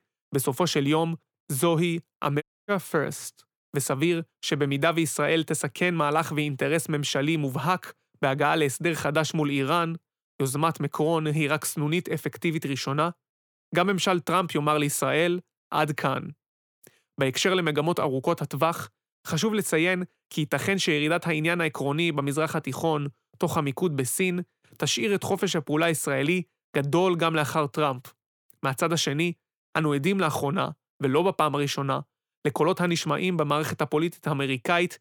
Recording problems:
audio cutting out; at 2.5 s

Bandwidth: 18.5 kHz